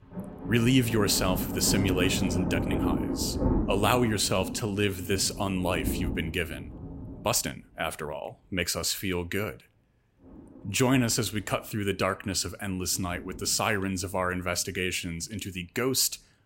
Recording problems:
rain or running water; loud; throughout; 5 dB below the speech
uneven, jittery; strongly; from 2.5 to 11 s

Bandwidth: 16 kHz